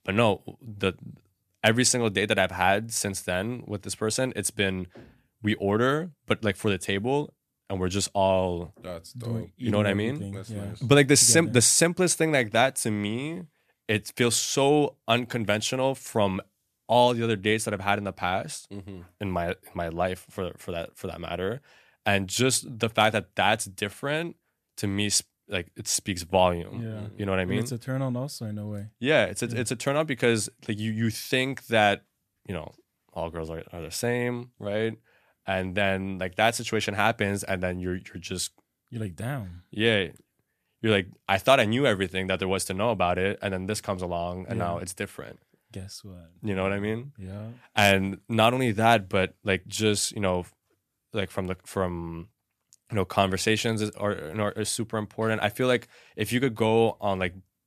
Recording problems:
none

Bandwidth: 14.5 kHz